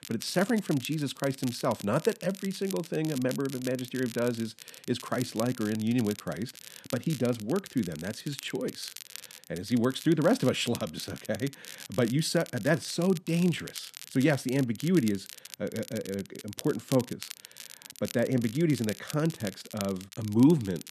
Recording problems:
crackle, like an old record; noticeable; 15 dB below the speech

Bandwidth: 13.5 kHz